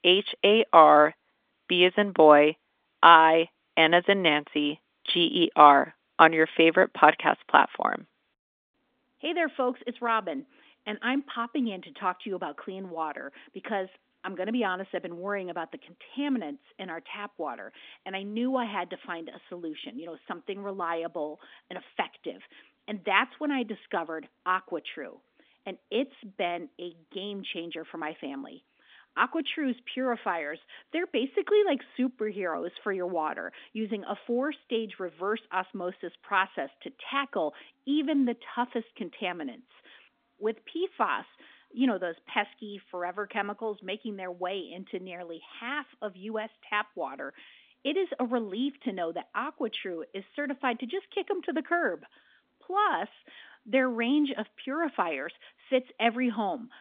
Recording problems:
phone-call audio; nothing above 3.5 kHz

